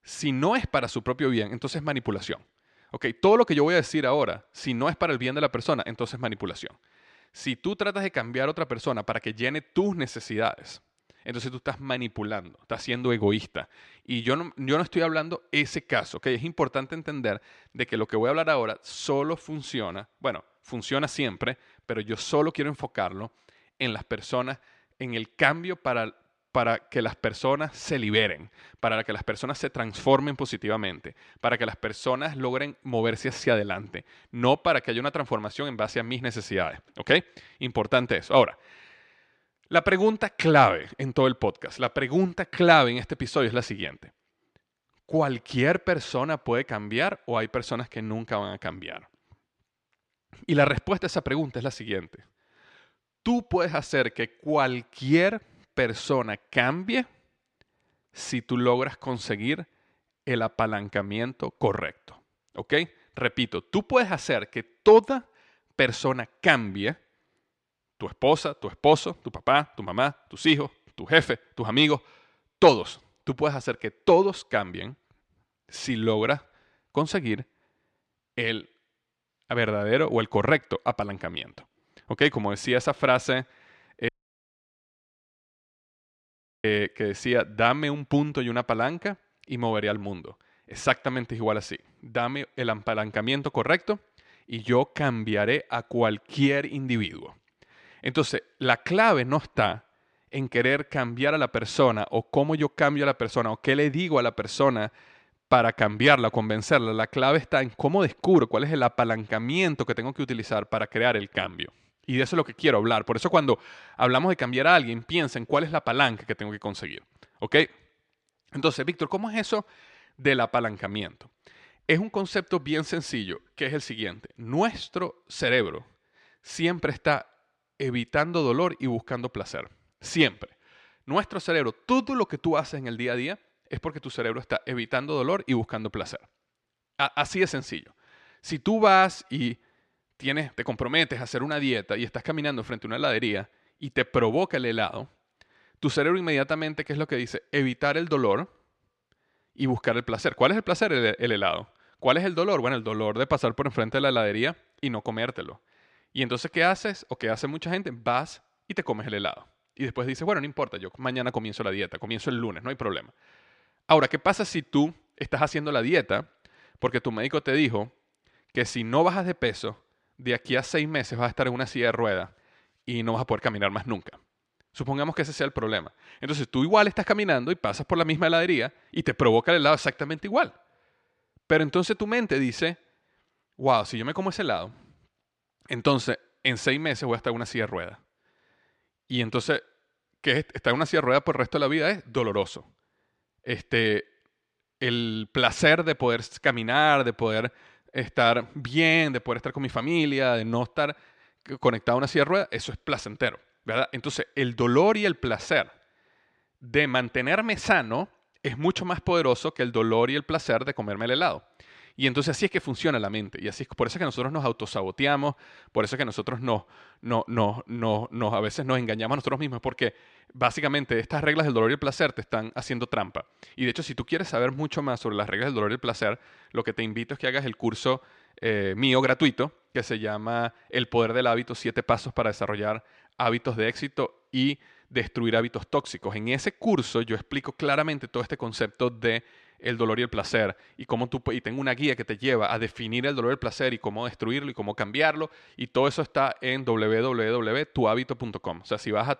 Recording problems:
audio cutting out; at 1:24 for 2.5 s

